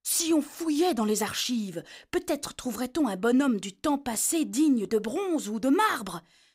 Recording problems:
none

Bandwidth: 15.5 kHz